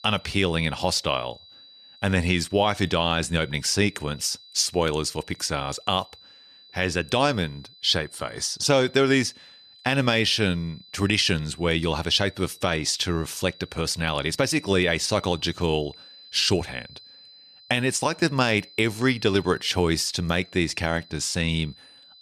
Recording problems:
high-pitched whine; faint; throughout; 4 kHz, 25 dB below the speech

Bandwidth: 13.5 kHz